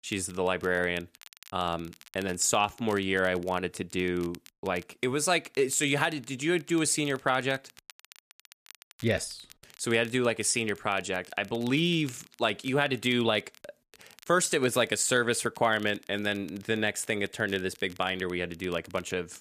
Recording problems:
crackle, like an old record; faint; 25 dB below the speech

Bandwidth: 14.5 kHz